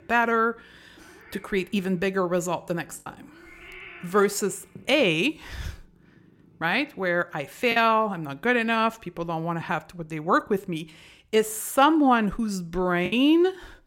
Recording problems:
animal sounds; faint; throughout; 25 dB below the speech
choppy; occasionally; 1% of the speech affected

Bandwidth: 16.5 kHz